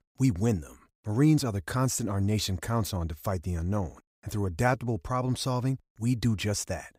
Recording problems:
none

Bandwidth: 15.5 kHz